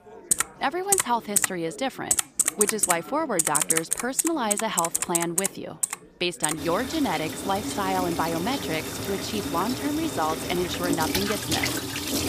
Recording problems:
household noises; very loud; throughout; 2 dB above the speech
chatter from many people; noticeable; throughout; 20 dB below the speech

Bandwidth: 15 kHz